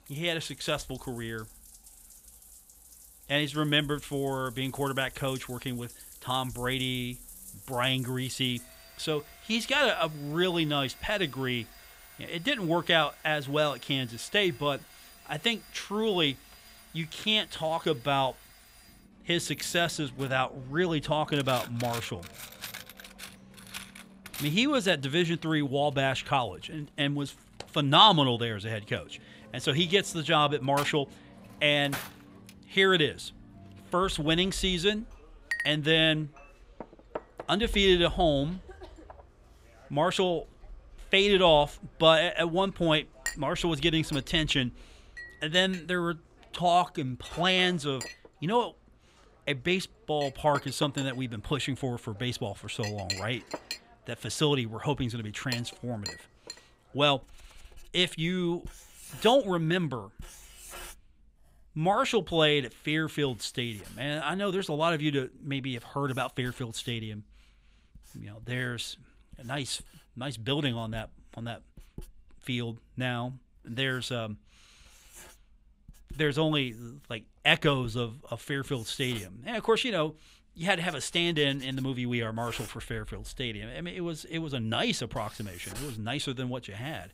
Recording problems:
household noises; noticeable; throughout; 15 dB below the speech

